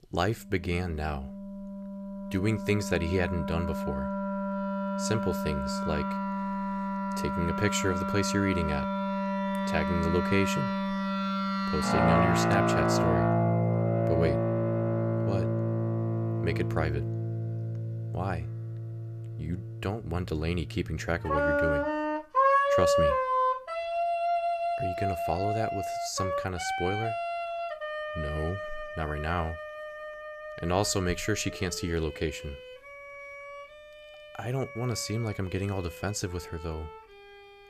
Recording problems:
background music; very loud; throughout; 2 dB above the speech

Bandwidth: 14.5 kHz